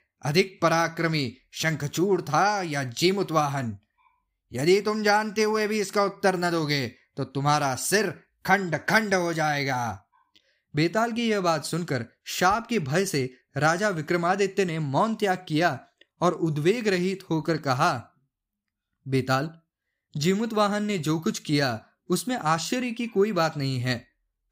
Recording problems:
none

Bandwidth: 15.5 kHz